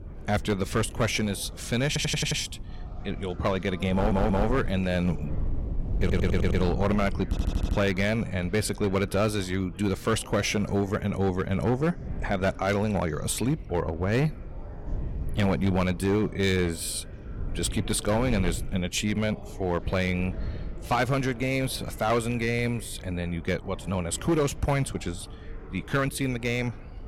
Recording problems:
distortion; slight; 6% of the sound clipped
wind noise on the microphone; occasional gusts; 20 dB below the speech
chatter from many people; faint; throughout; 20 dB below the speech
audio stuttering; 4 times, first at 2 s

